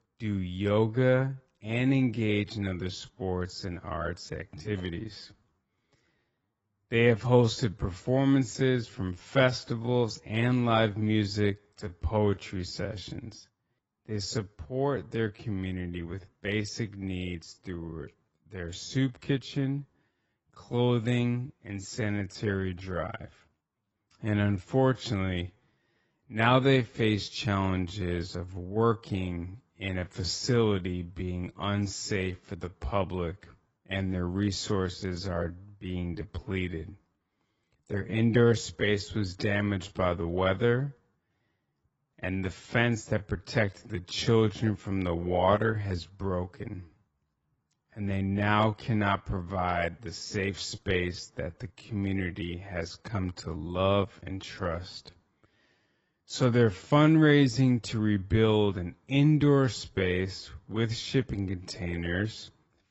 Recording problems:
garbled, watery; badly; nothing above 7.5 kHz
wrong speed, natural pitch; too slow; 0.6 times normal speed

